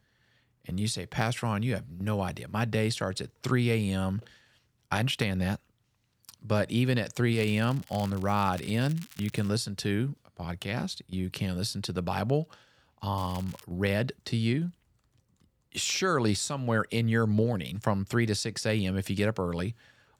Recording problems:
crackling; faint; from 7.5 to 9.5 s and at 13 s; 20 dB below the speech

